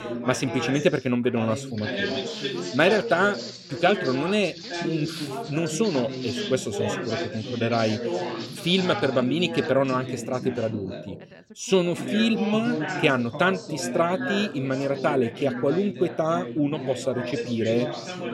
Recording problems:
background chatter; loud; throughout; 4 voices, 7 dB below the speech
footsteps; faint; from 1.5 to 9.5 s; peak 10 dB below the speech

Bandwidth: 16 kHz